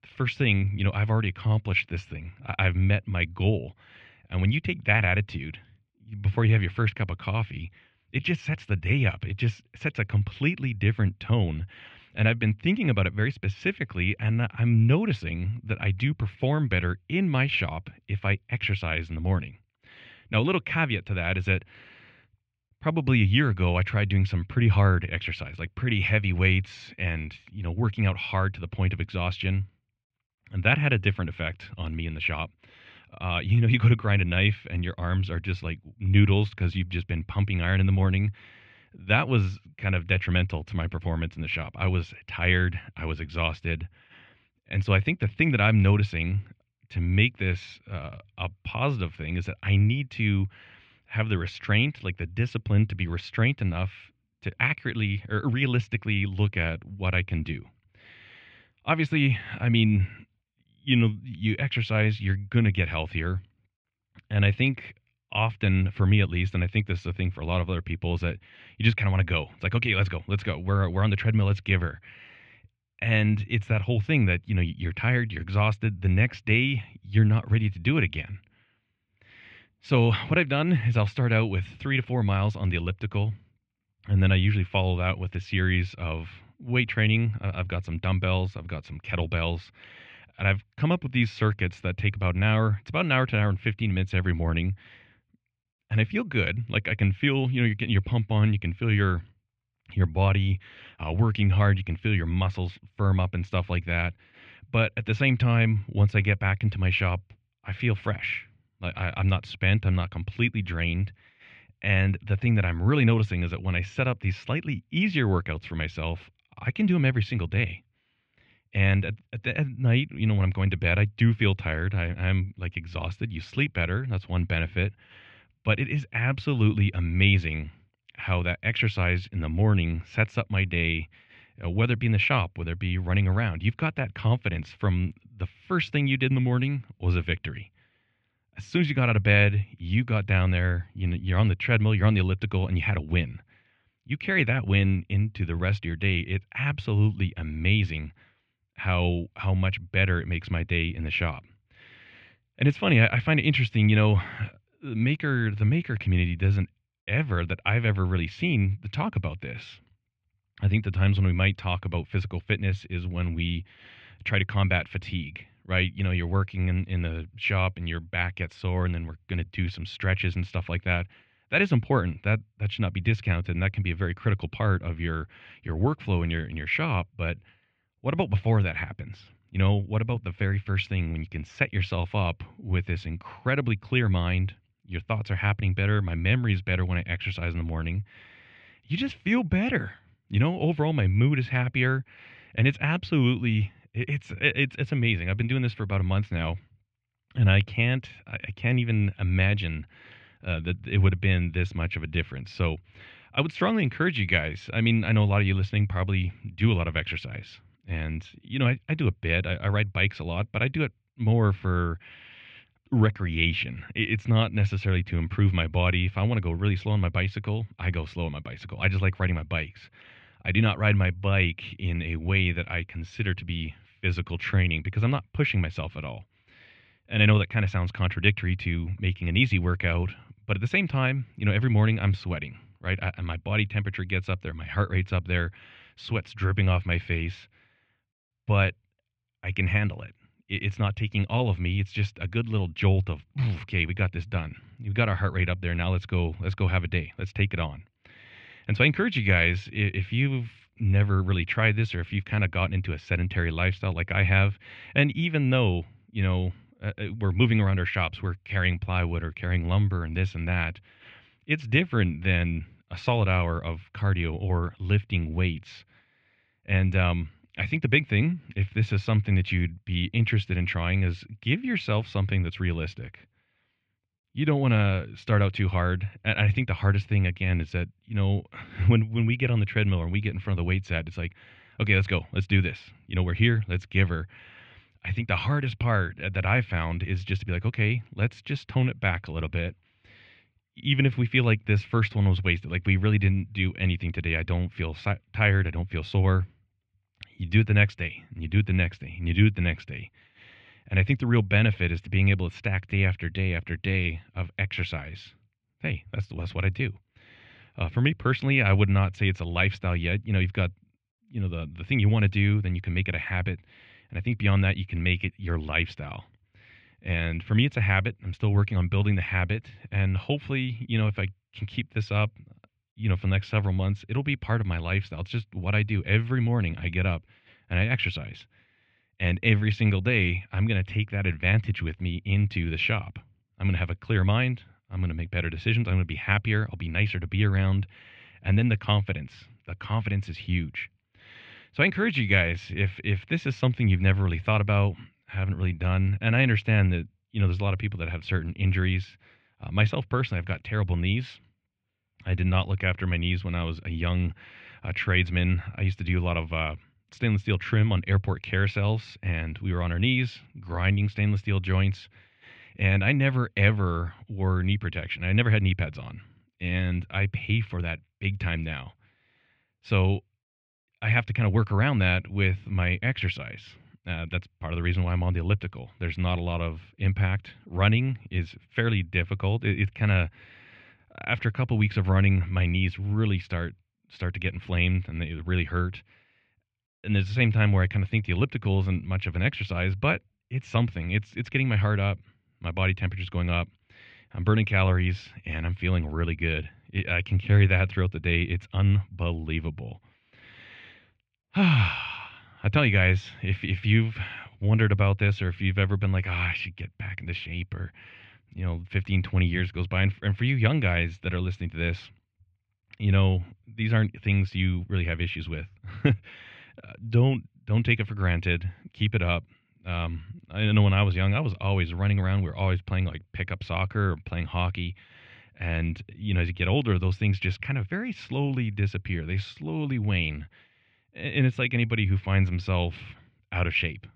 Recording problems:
muffled; very; fading above 3 kHz

